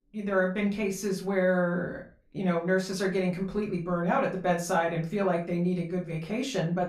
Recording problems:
off-mic speech; far
room echo; very slight; dies away in 0.3 s

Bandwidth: 14.5 kHz